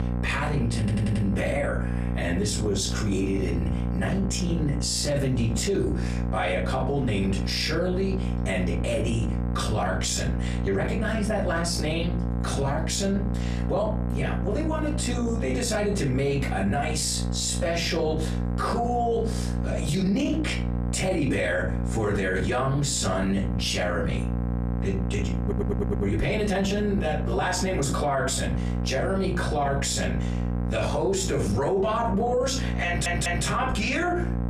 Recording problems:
off-mic speech; far
room echo; slight; dies away in 0.3 s
squashed, flat; somewhat
electrical hum; noticeable; throughout; 60 Hz, 10 dB below the speech
audio stuttering; at 1 s, at 25 s and at 33 s

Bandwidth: 14 kHz